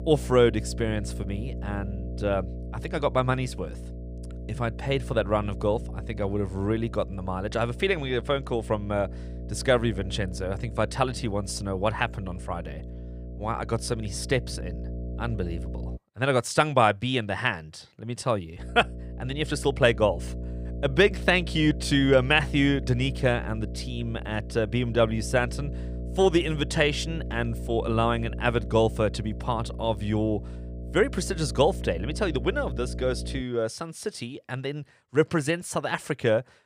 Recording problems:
electrical hum; noticeable; until 16 s and from 19 to 33 s; 60 Hz, 20 dB below the speech

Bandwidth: 15 kHz